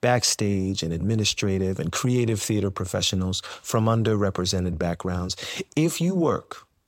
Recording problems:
none

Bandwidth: 16 kHz